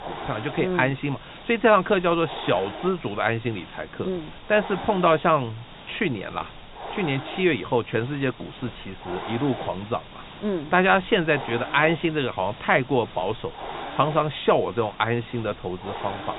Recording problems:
high frequencies cut off; severe; nothing above 4 kHz
hiss; noticeable; throughout; 15 dB below the speech

